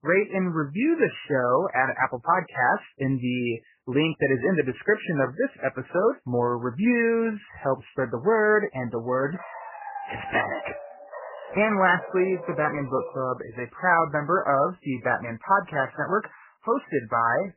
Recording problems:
garbled, watery; badly; nothing above 3 kHz
dog barking; faint; from 9.5 to 13 s; peak 10 dB below the speech

